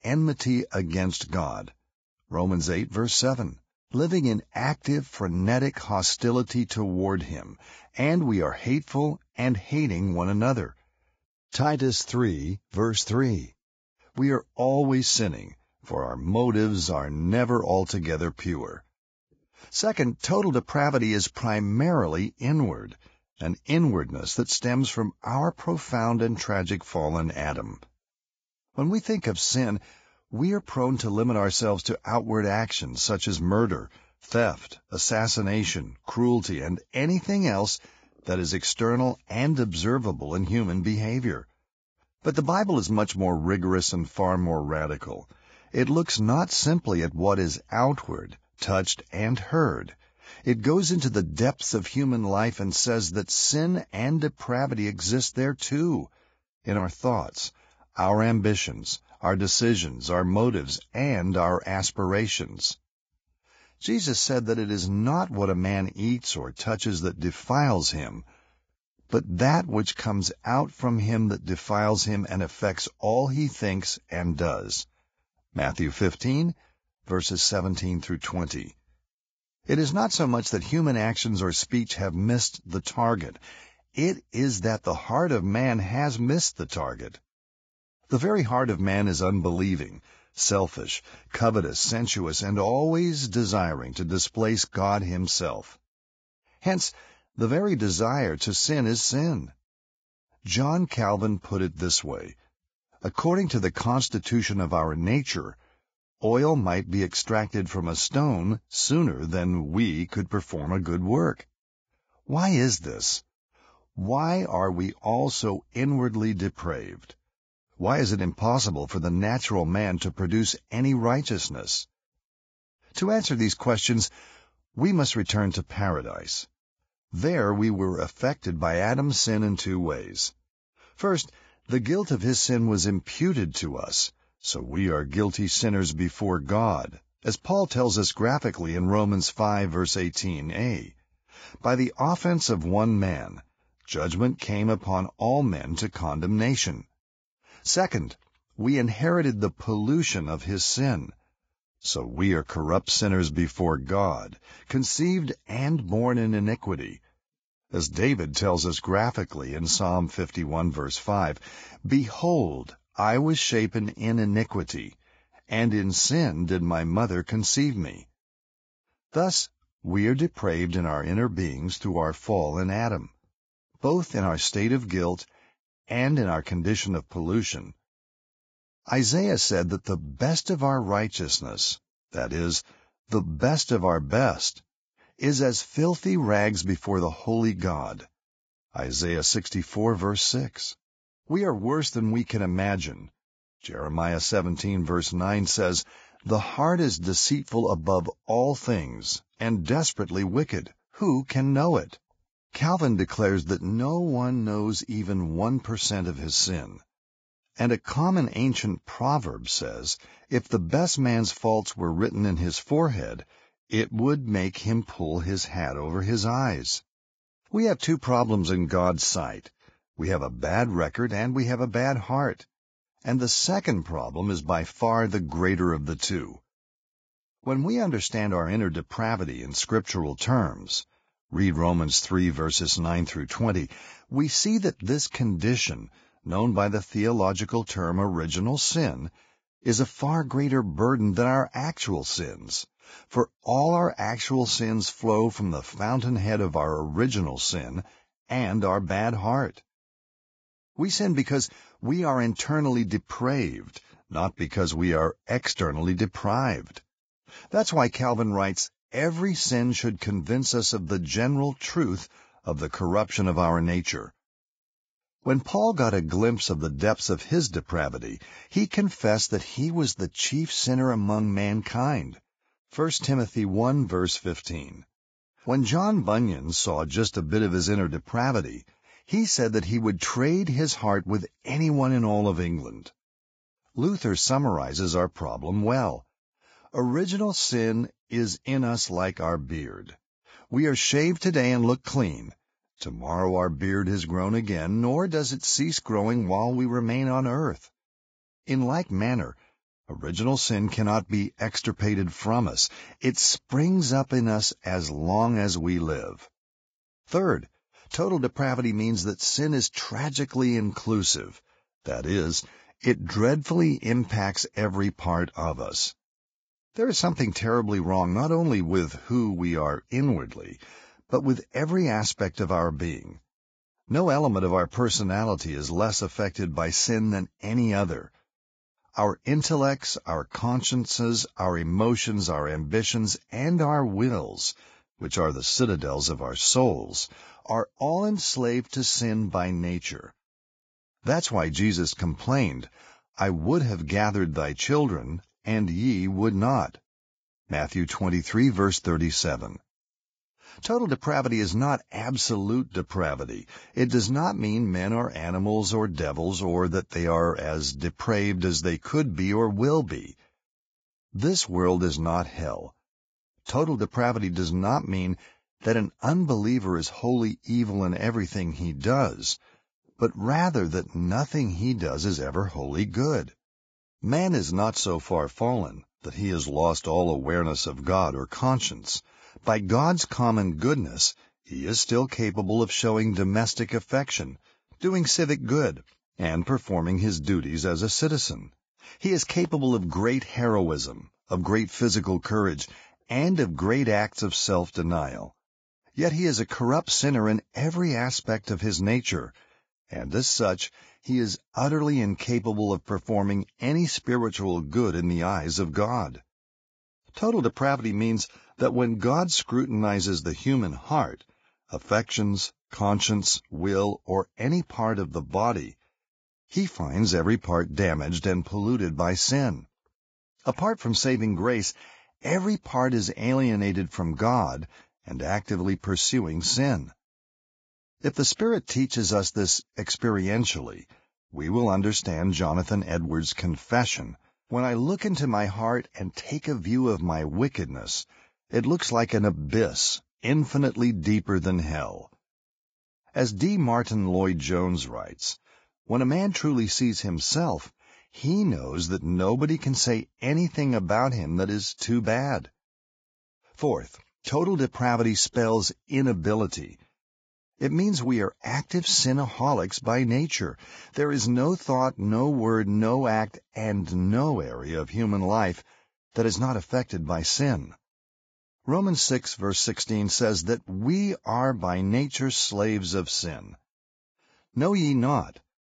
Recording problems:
garbled, watery; badly; nothing above 7.5 kHz

